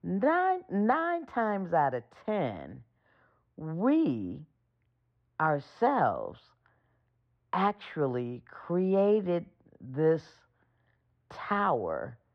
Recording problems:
muffled; very; fading above 4 kHz

